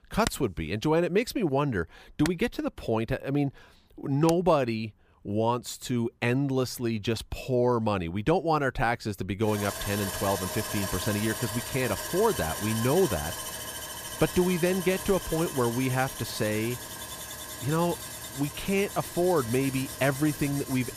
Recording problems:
machinery noise; loud; throughout; 7 dB below the speech

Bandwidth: 15 kHz